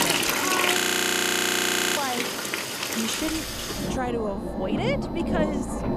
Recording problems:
household noises; very loud; throughout; 6 dB above the speech
rain or running water; very loud; throughout; as loud as the speech
high-pitched whine; very faint; at the start and from 3.5 s on; 4 kHz, 30 dB below the speech
audio freezing; at 1 s for 1 s

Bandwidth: 14.5 kHz